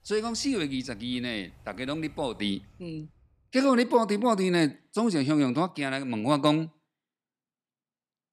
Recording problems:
animal sounds; faint; until 2.5 s; 30 dB below the speech

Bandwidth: 14.5 kHz